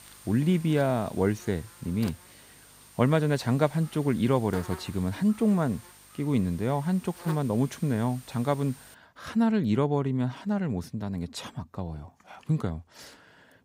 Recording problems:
electrical hum; noticeable; until 9 s; 50 Hz, 15 dB below the speech

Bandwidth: 15.5 kHz